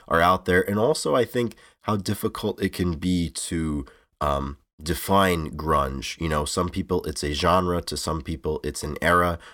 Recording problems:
none

